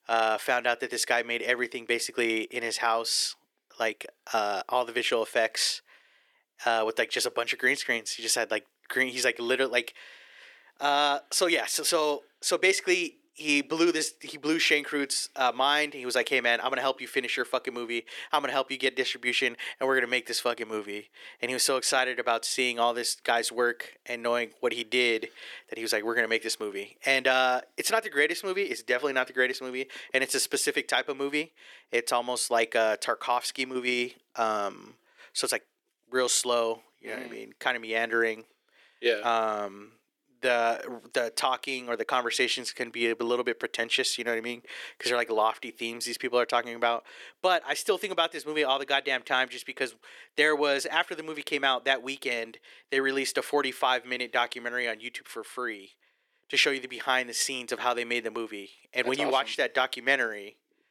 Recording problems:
thin; somewhat; fading below 350 Hz

